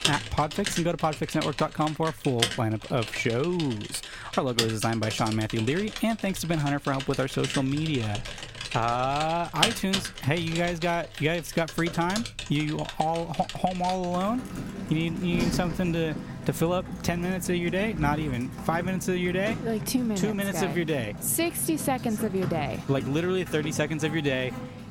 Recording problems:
household noises; loud; throughout; 7 dB below the speech

